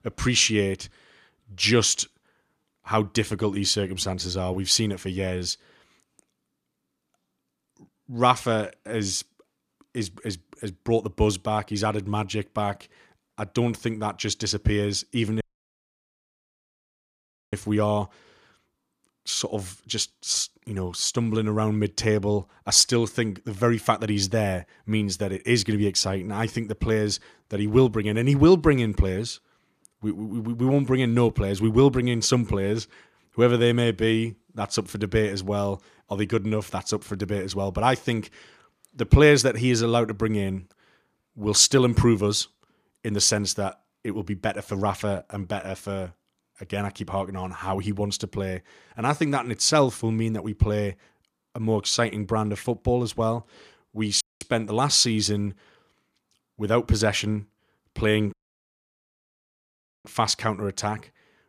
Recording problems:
audio cutting out; at 15 s for 2 s, at 54 s and at 58 s for 1.5 s

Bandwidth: 14.5 kHz